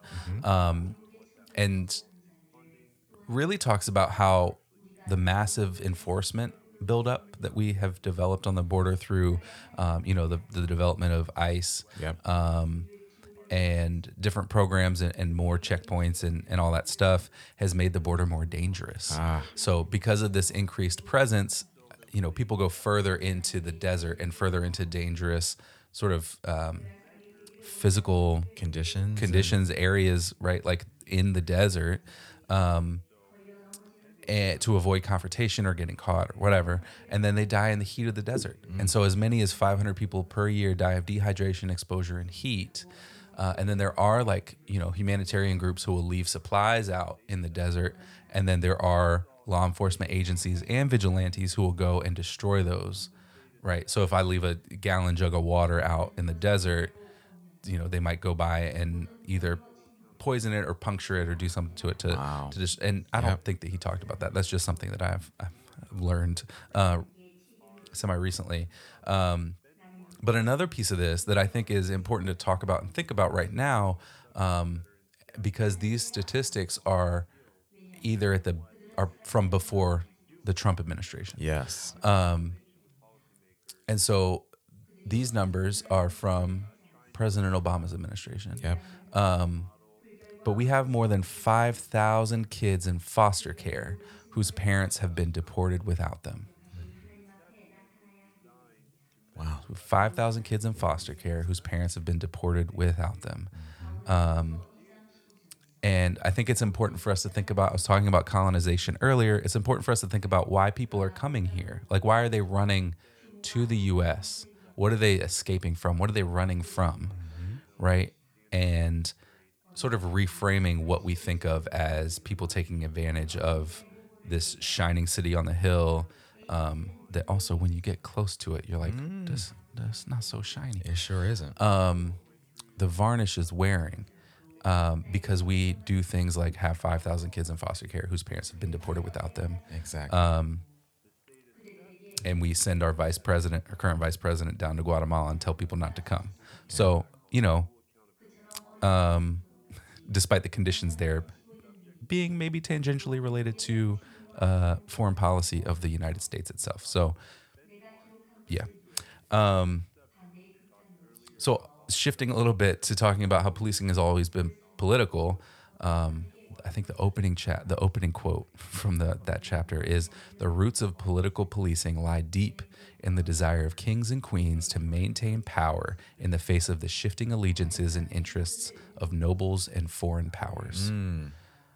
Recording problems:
background chatter; faint; throughout; 2 voices, 30 dB below the speech

